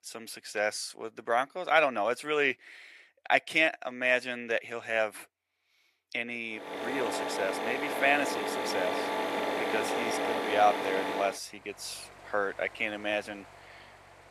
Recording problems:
thin; very; fading below 500 Hz
machinery noise; loud; from 6.5 s on; 2 dB below the speech

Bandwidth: 14.5 kHz